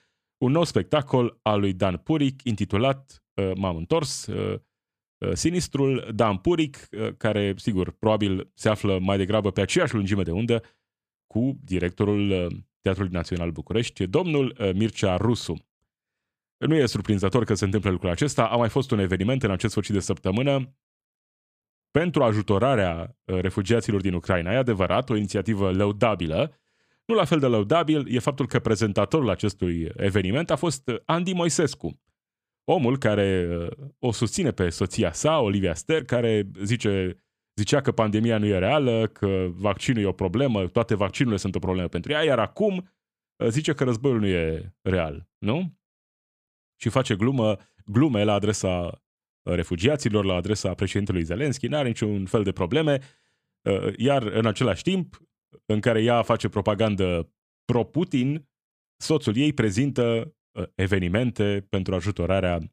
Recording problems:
none

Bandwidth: 14.5 kHz